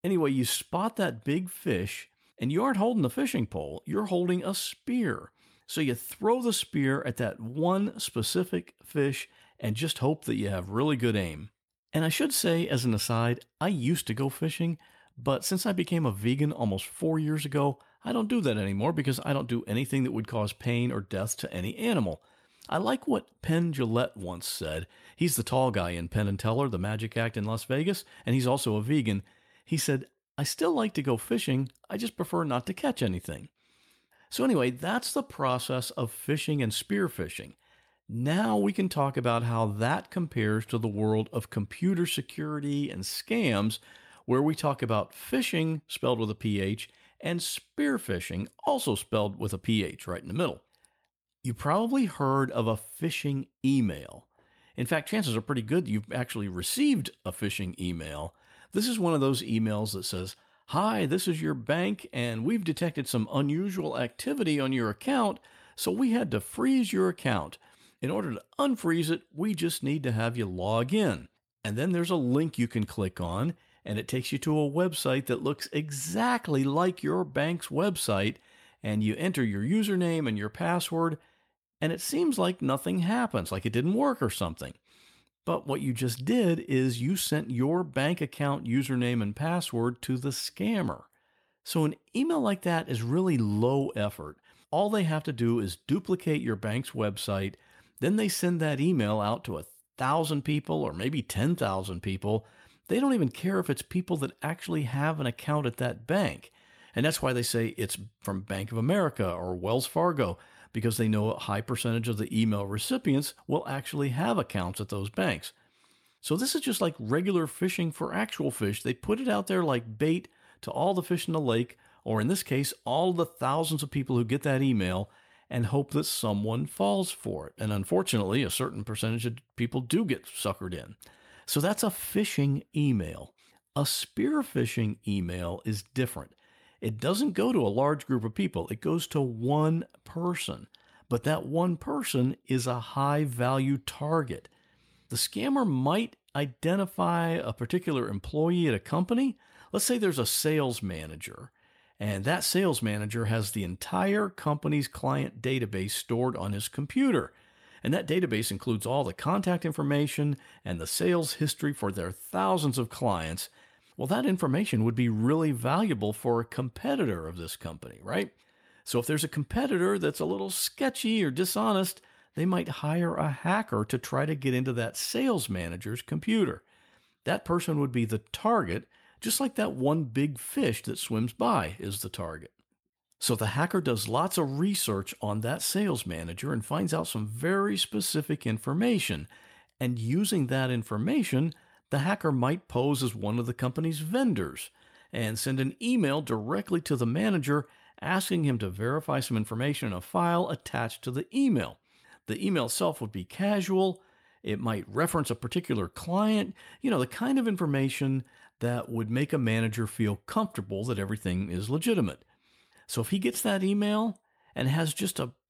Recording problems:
none

